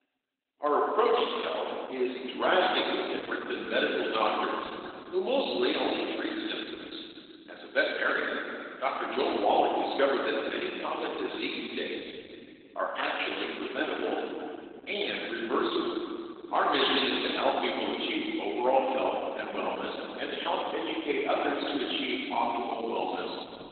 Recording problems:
garbled, watery; badly; nothing above 4 kHz
room echo; noticeable; dies away in 2.4 s
off-mic speech; somewhat distant
thin; very slightly; fading below 250 Hz

